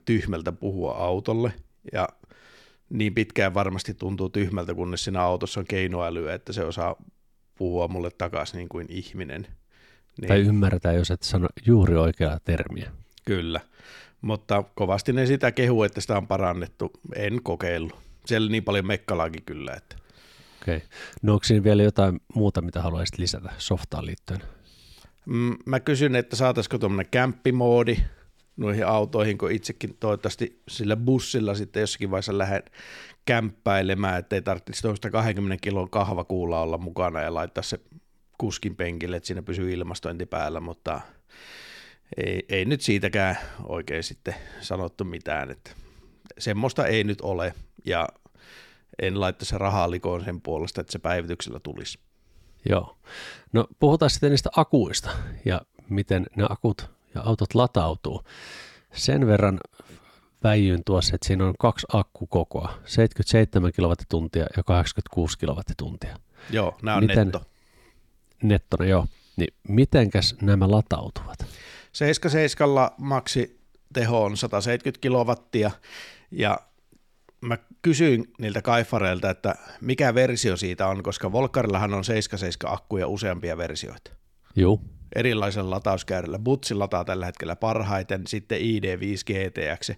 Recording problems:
none

